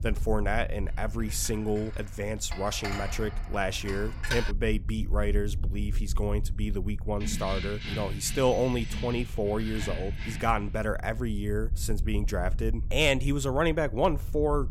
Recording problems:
low rumble; faint; throughout; 25 dB below the speech
clattering dishes; noticeable; from 1 to 4.5 s; peak 3 dB below the speech
jangling keys; noticeable; from 7 to 11 s; peak 5 dB below the speech

